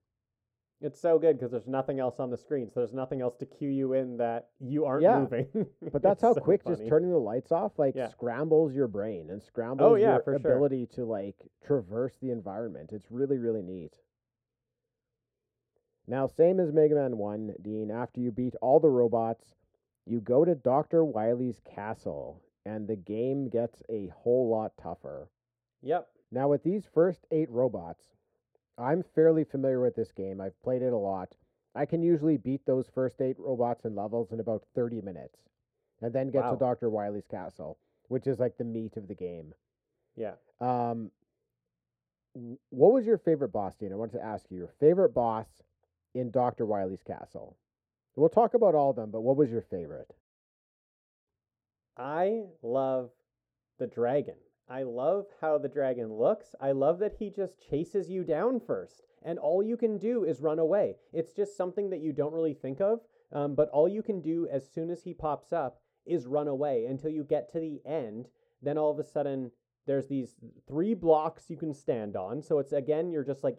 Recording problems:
muffled; very; fading above 1.5 kHz

